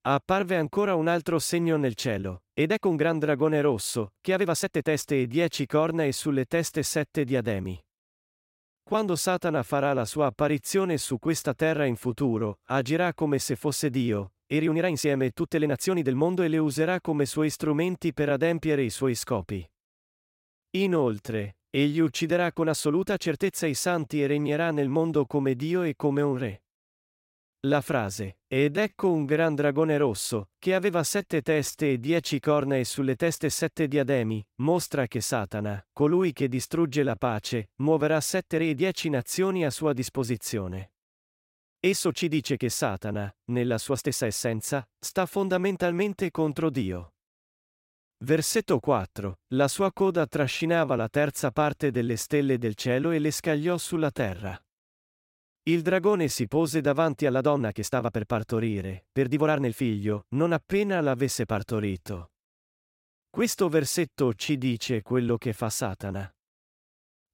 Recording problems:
uneven, jittery; strongly; from 2.5 s to 1:05

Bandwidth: 16 kHz